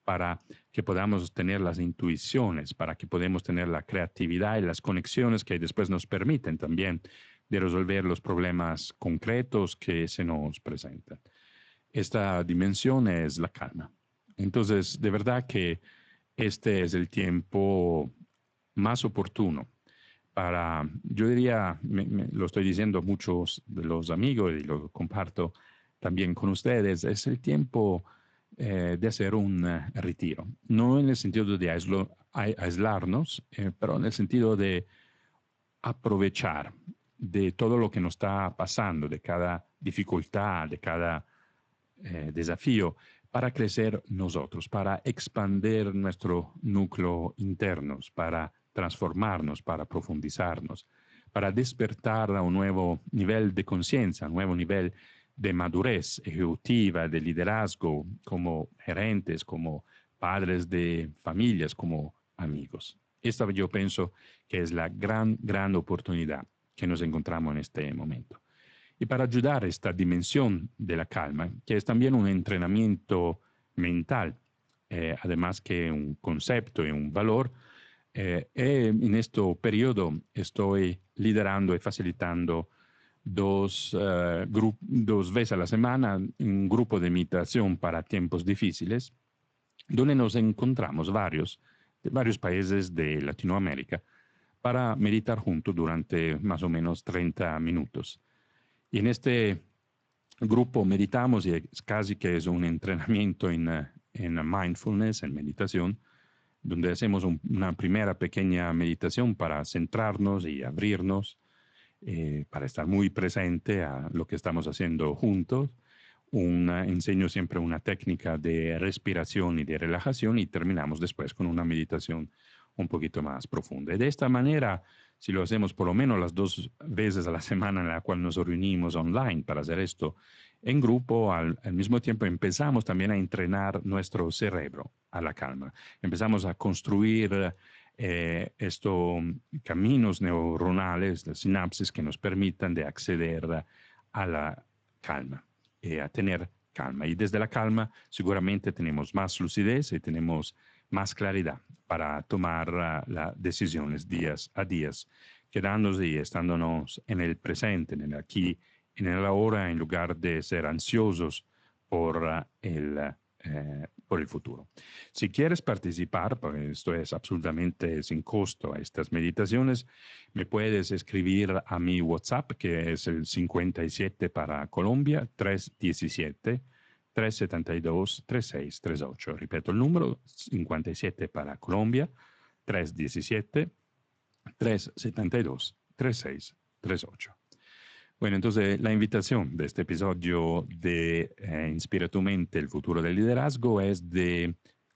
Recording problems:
garbled, watery; slightly; nothing above 7.5 kHz

